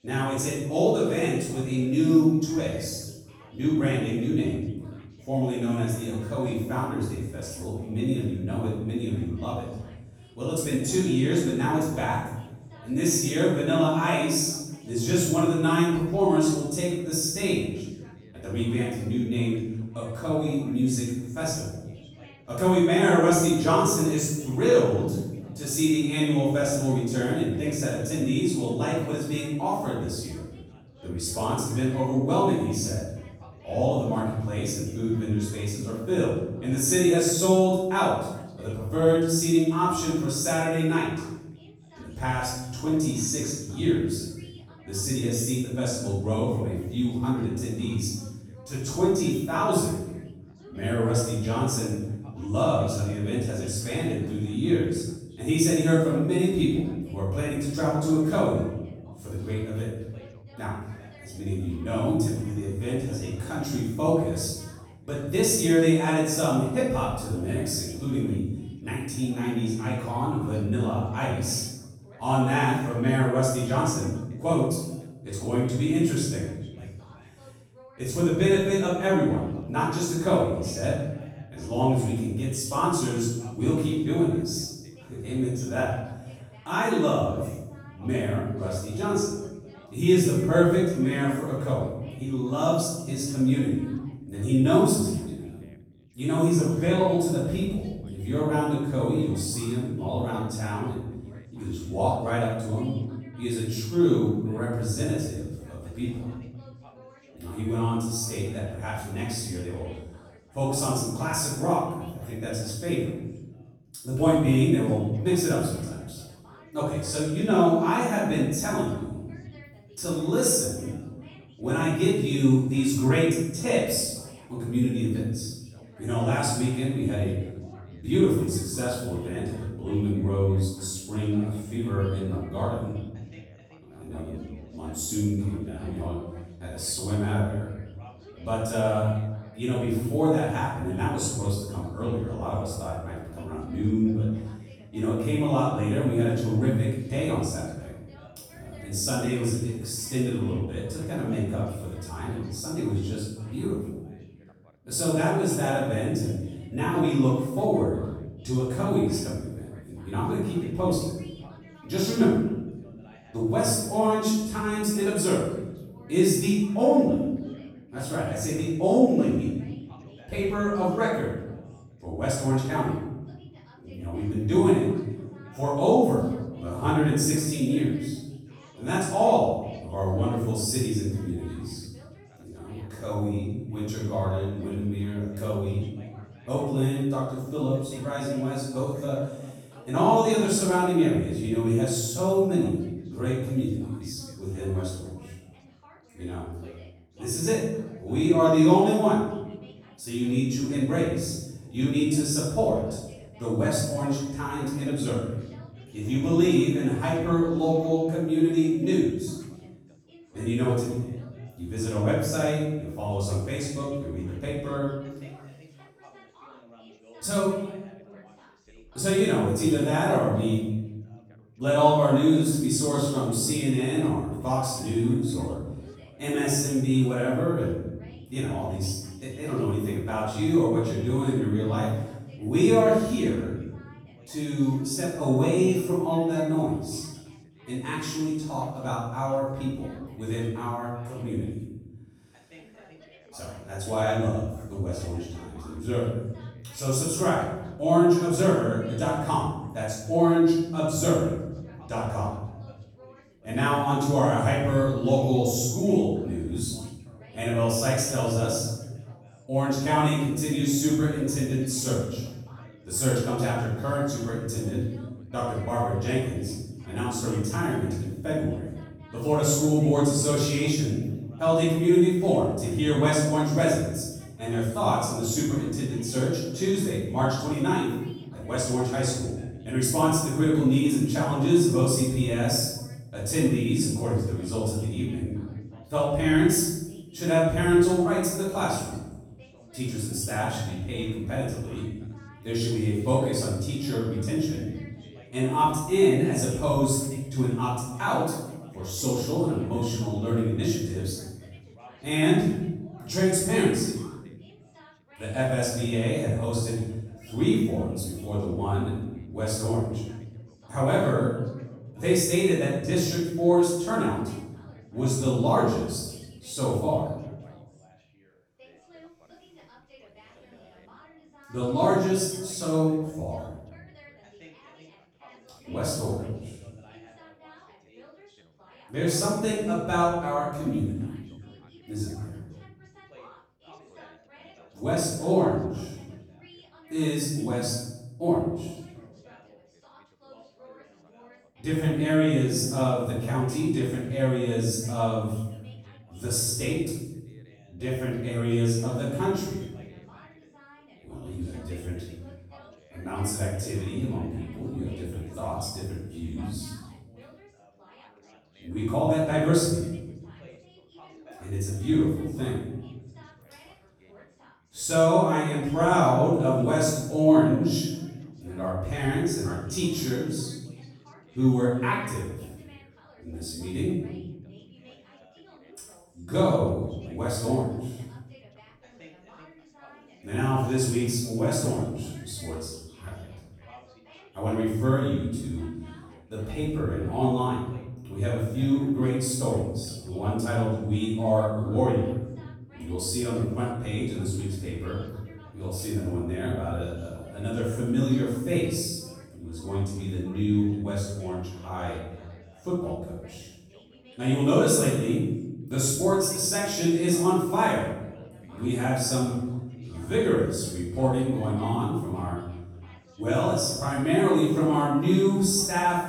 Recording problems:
room echo; strong; dies away in 0.9 s
off-mic speech; far
background chatter; faint; throughout; 3 voices, 25 dB below the speech

